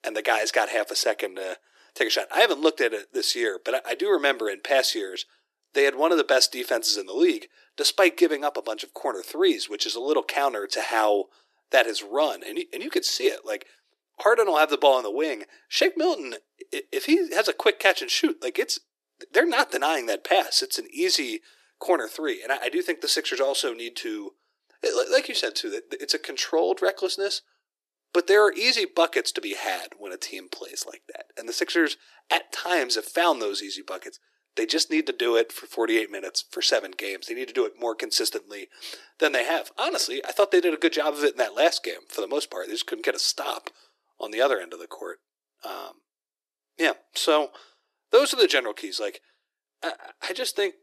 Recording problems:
thin; very; fading below 350 Hz

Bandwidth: 13.5 kHz